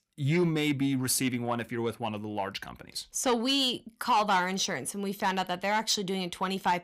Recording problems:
distortion; slight; 10 dB below the speech

